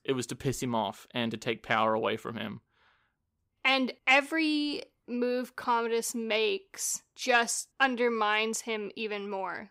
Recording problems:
none

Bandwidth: 15.5 kHz